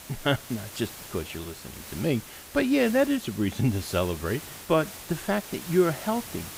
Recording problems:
hiss; noticeable; throughout; 15 dB below the speech

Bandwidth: 15.5 kHz